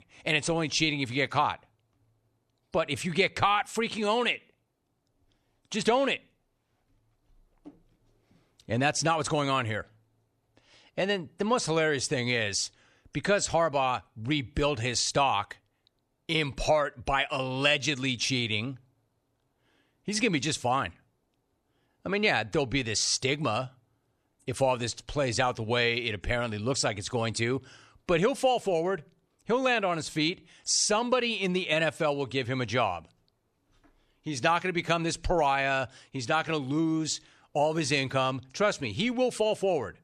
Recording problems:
none

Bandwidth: 13.5 kHz